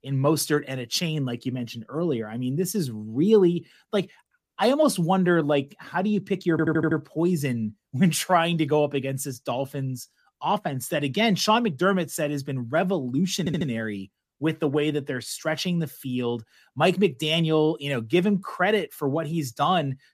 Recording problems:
audio stuttering; at 6.5 s and at 13 s

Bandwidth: 14.5 kHz